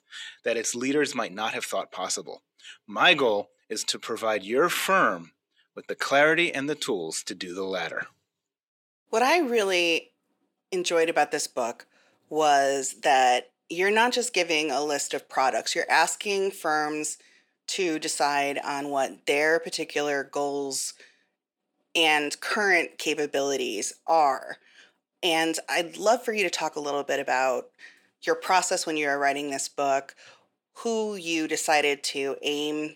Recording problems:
thin; somewhat; fading below 450 Hz

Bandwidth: 17.5 kHz